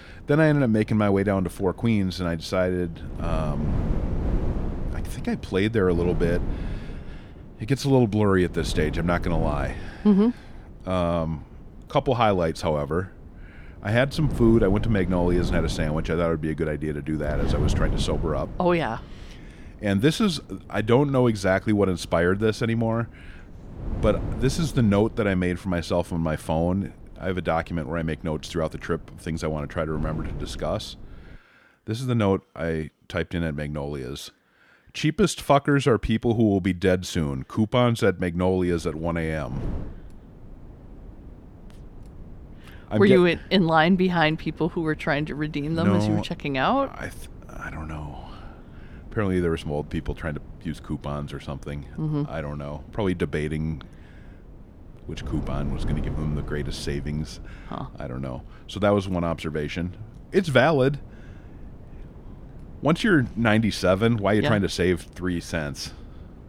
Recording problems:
wind noise on the microphone; occasional gusts; until 31 s and from 39 s on; 20 dB below the speech

